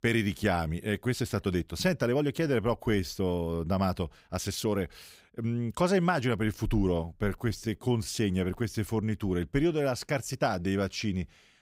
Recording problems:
uneven, jittery; strongly; from 1 to 11 s

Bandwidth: 15.5 kHz